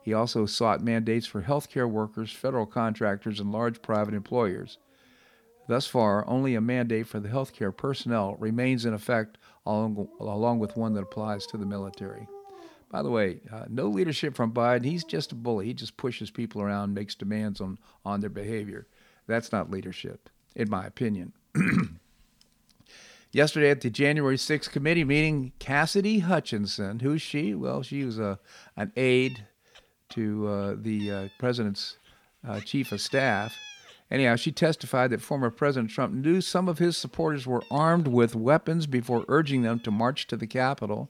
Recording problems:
animal sounds; faint; throughout; 20 dB below the speech

